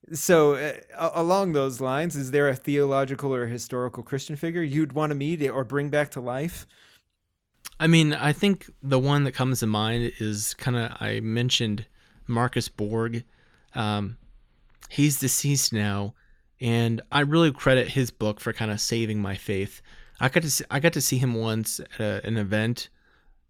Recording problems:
none

